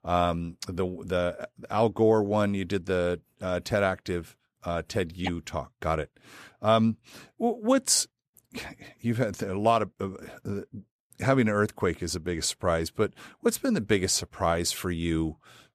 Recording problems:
none

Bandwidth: 14.5 kHz